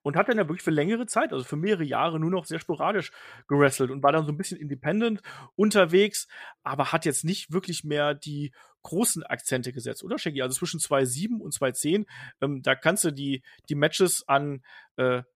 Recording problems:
none

